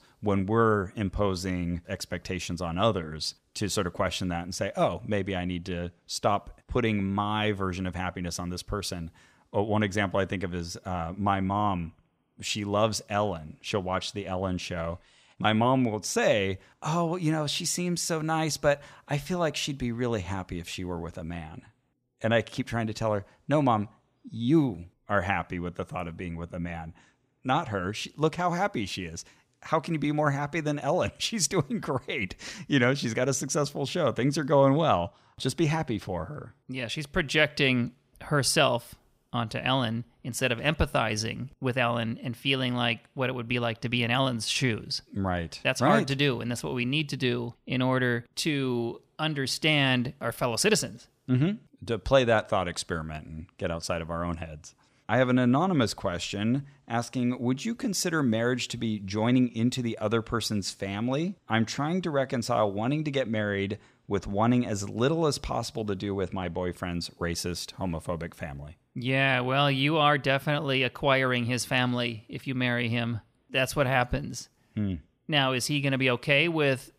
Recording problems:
none

